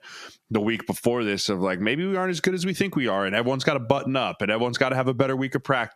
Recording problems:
squashed, flat; heavily

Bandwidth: 14.5 kHz